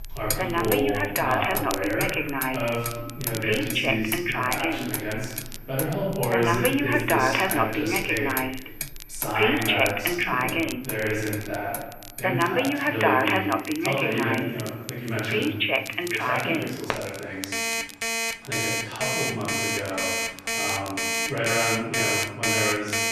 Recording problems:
off-mic speech; far
room echo; noticeable; dies away in 1.1 s
alarms or sirens; very loud; throughout; 4 dB above the speech
traffic noise; loud; throughout; 6 dB below the speech
crackle, like an old record; noticeable; 15 dB below the speech

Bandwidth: 13.5 kHz